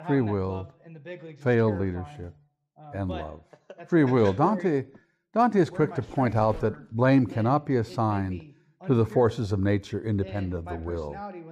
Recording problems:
voice in the background; noticeable; throughout; 15 dB below the speech

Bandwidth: 15 kHz